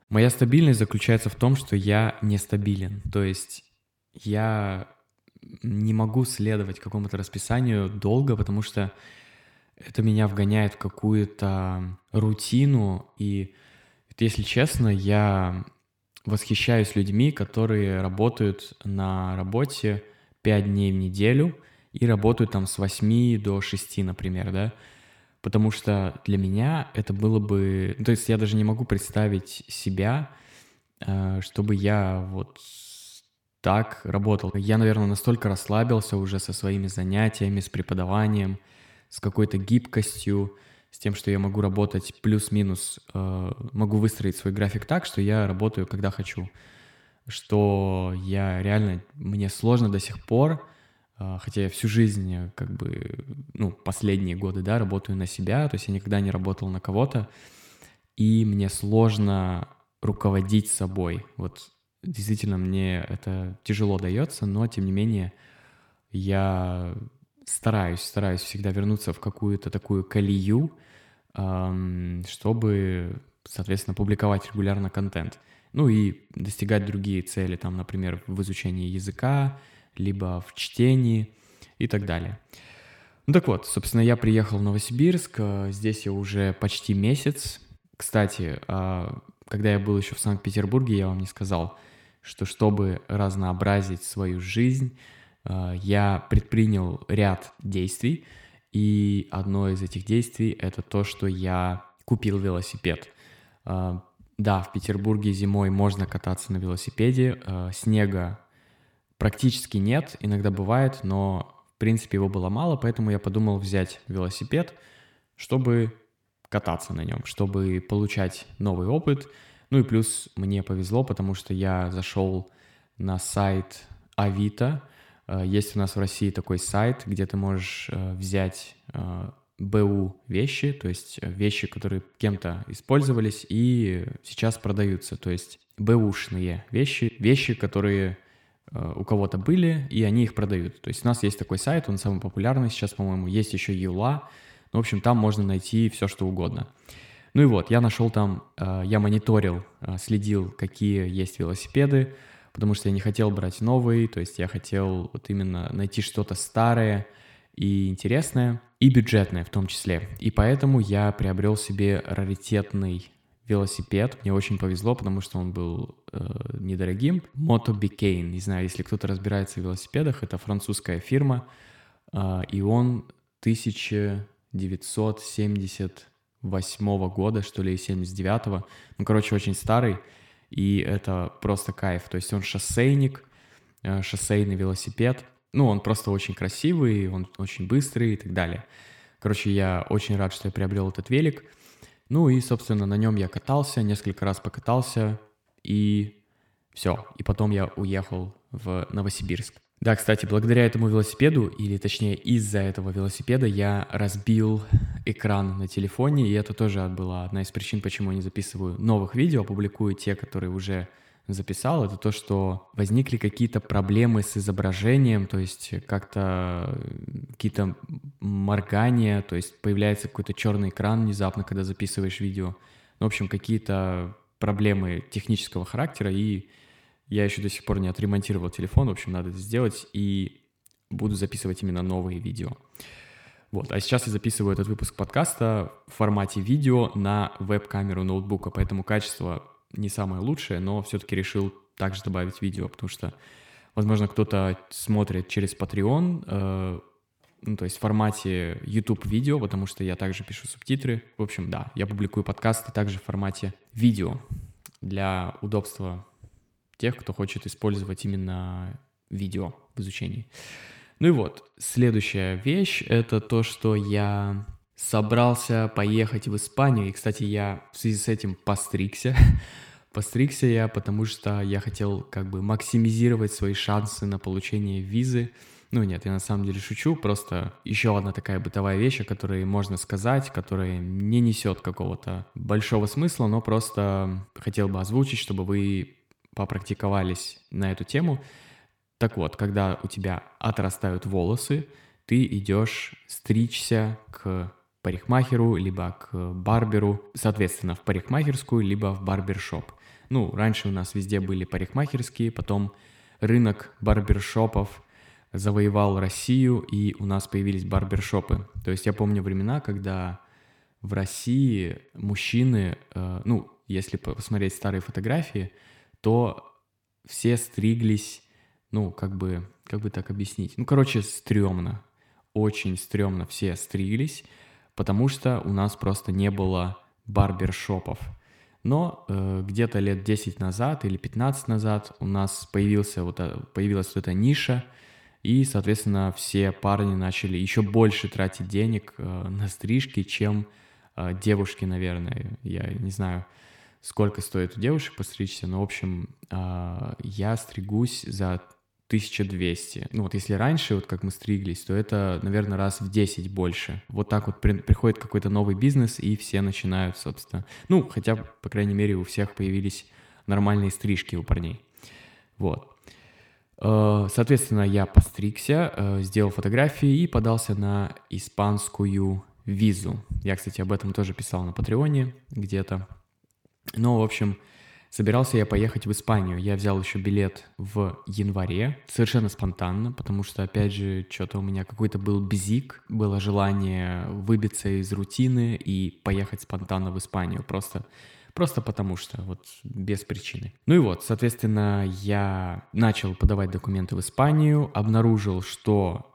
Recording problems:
echo of what is said; faint; throughout; 90 ms later, 20 dB below the speech

